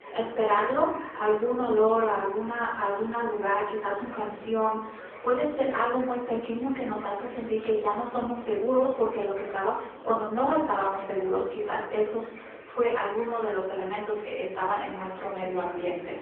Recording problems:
phone-call audio; poor line
off-mic speech; far
muffled; very; fading above 3 kHz
room echo; noticeable; dies away in 0.8 s
echo of what is said; faint; throughout; 250 ms later, 25 dB below the speech
murmuring crowd; noticeable; throughout; 15 dB below the speech

